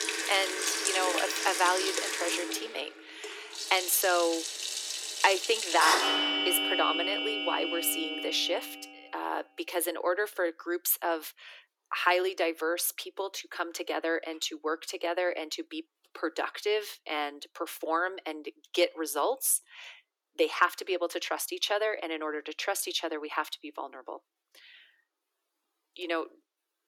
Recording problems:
thin; very; fading below 300 Hz
household noises; very loud; until 8.5 s; as loud as the speech

